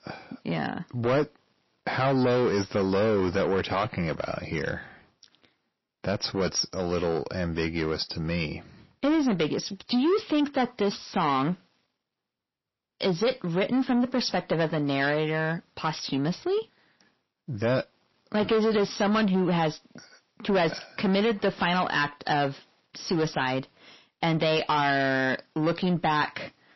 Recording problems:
distortion; heavy; 8 dB below the speech
garbled, watery; slightly; nothing above 5.5 kHz

